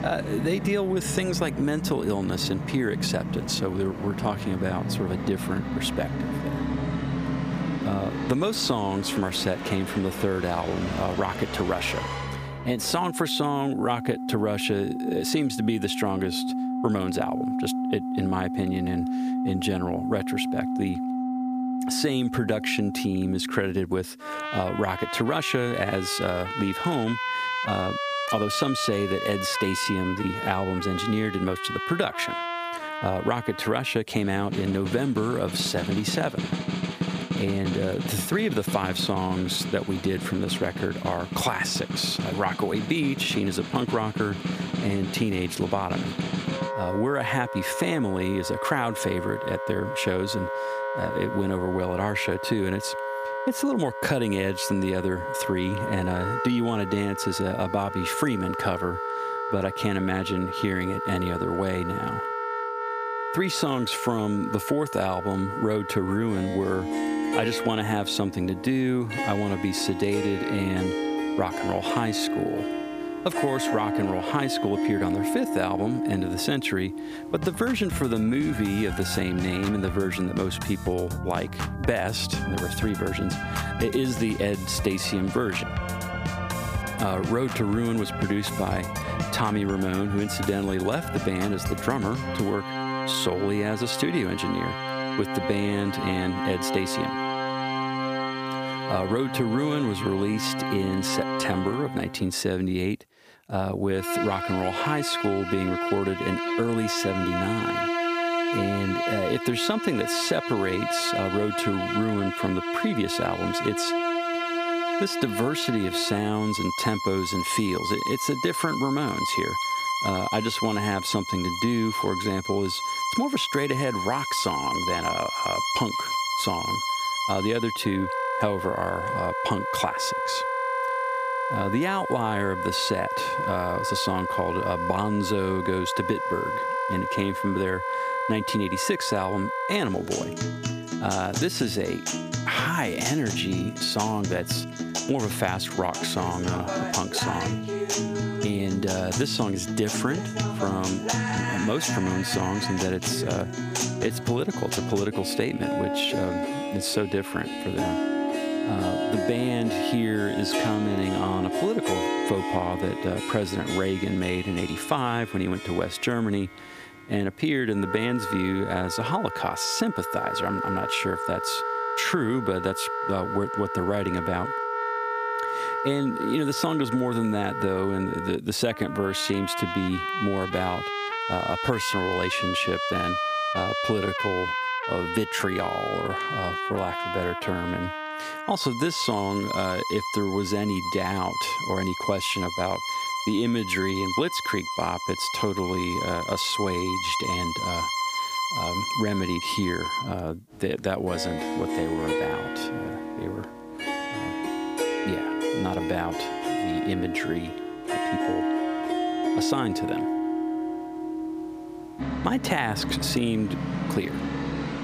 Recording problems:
squashed, flat; somewhat
background music; loud; throughout; 3 dB below the speech

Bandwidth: 15 kHz